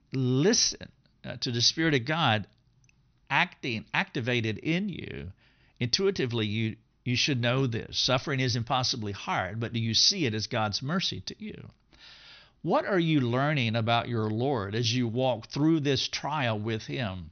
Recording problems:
high frequencies cut off; noticeable; nothing above 6 kHz

